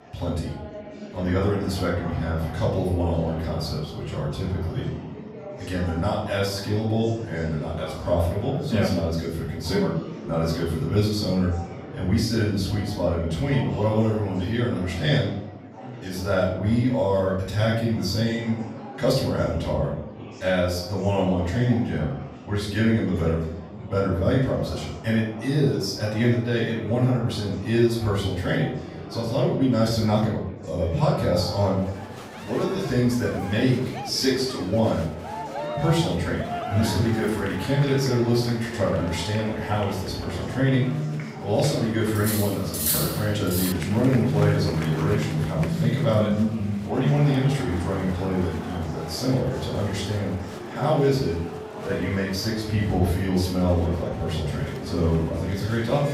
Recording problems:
off-mic speech; far
room echo; noticeable; dies away in 0.5 s
background music; loud; from 31 s on; 9 dB below the speech
murmuring crowd; noticeable; throughout; 10 dB below the speech
clattering dishes; loud; from 42 to 44 s; peak 2 dB above the speech

